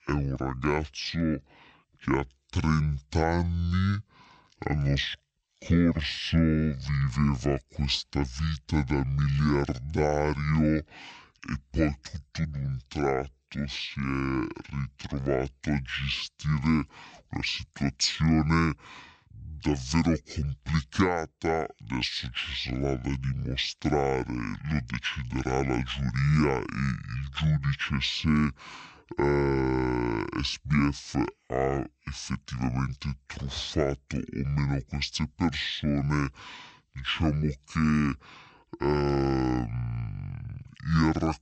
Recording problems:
wrong speed and pitch; too slow and too low; 0.5 times normal speed

